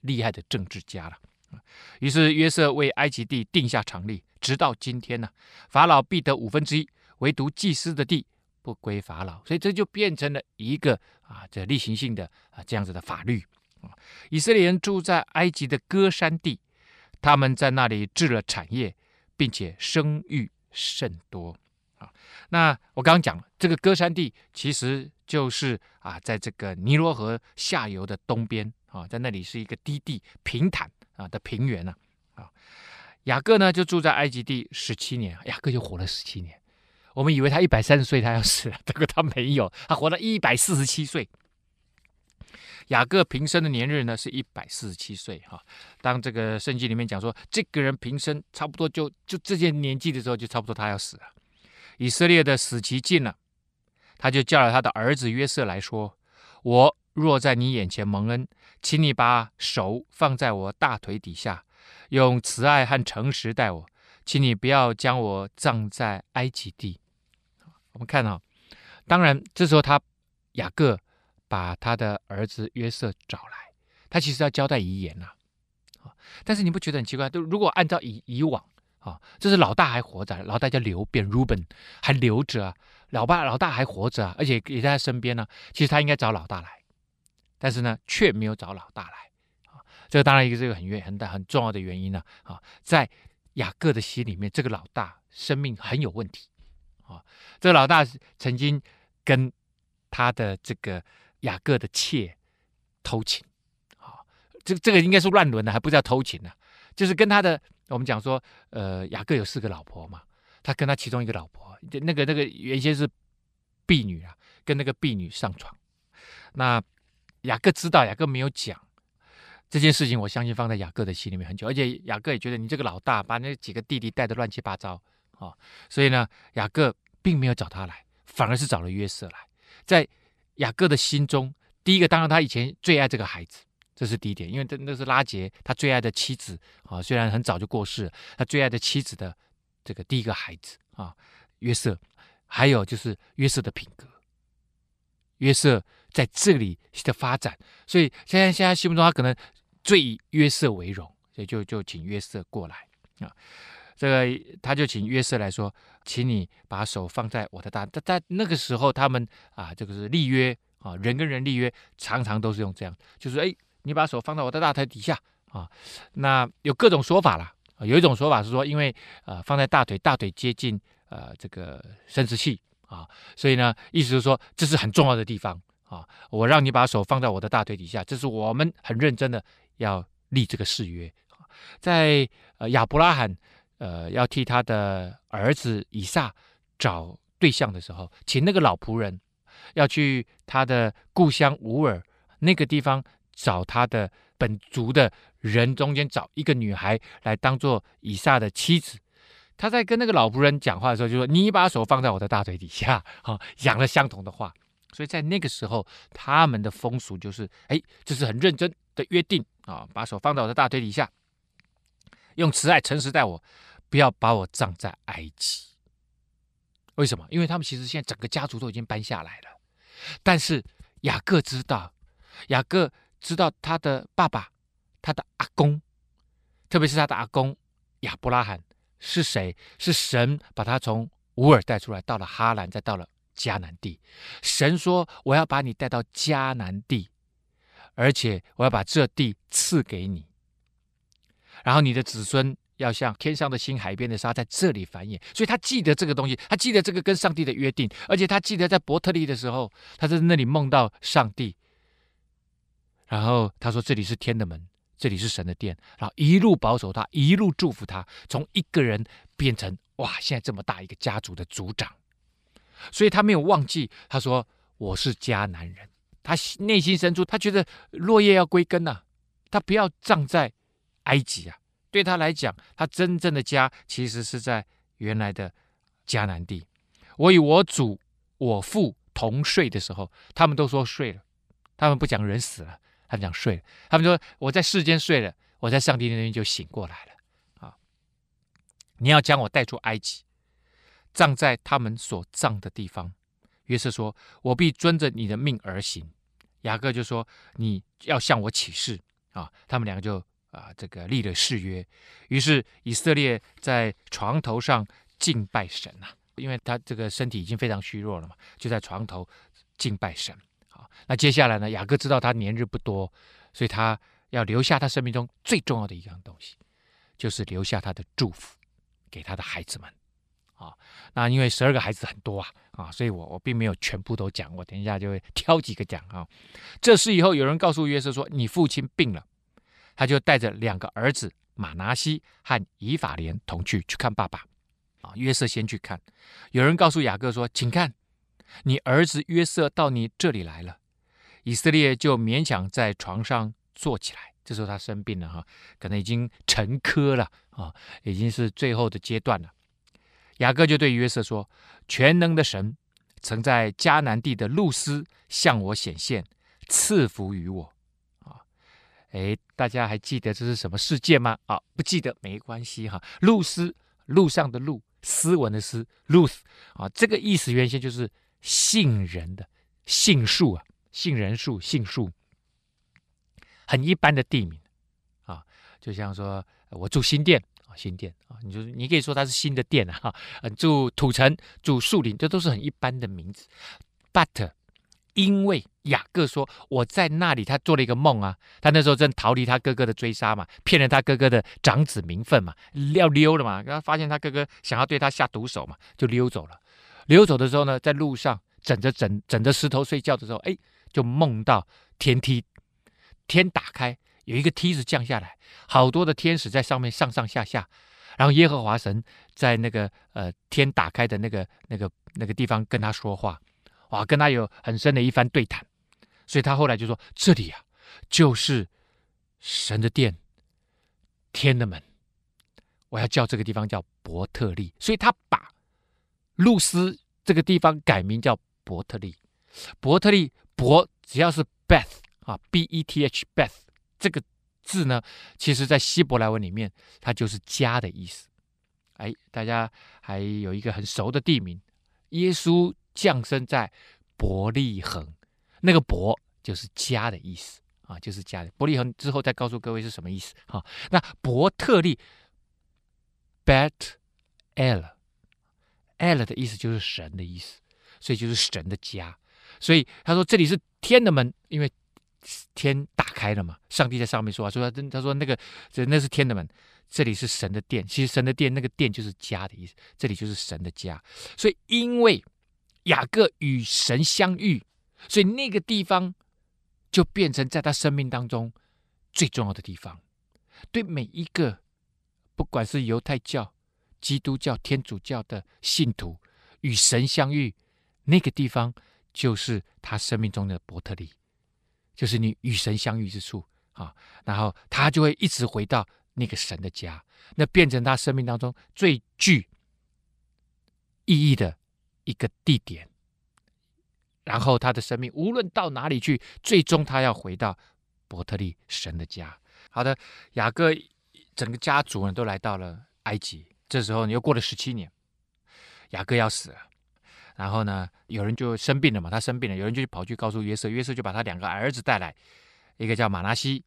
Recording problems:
none

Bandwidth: 14.5 kHz